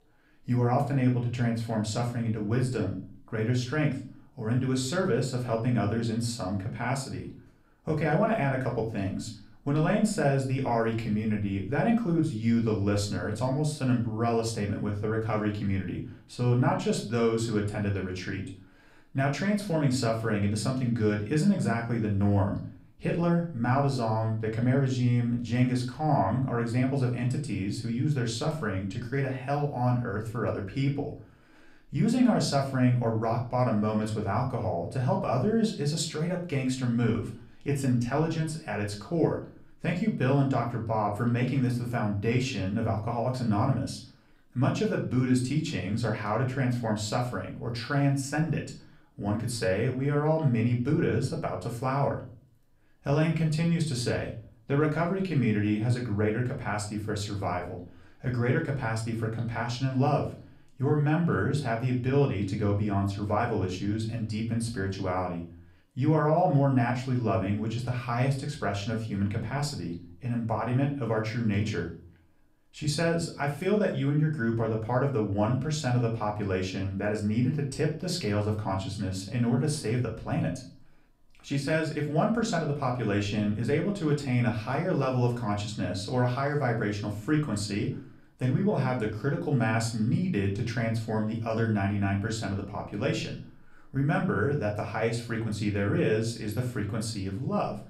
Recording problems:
off-mic speech; far
room echo; slight; dies away in 0.4 s

